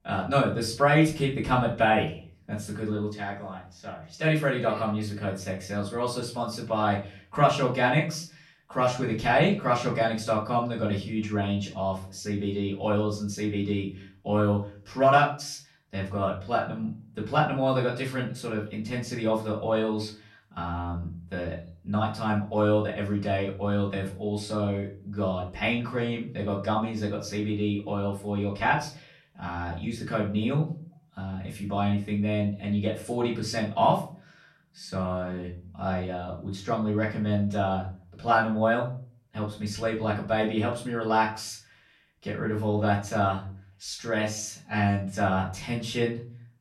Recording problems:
off-mic speech; far
room echo; slight; dies away in 0.4 s

